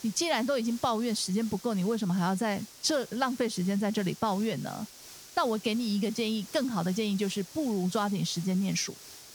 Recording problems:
hiss; noticeable; throughout; 15 dB below the speech

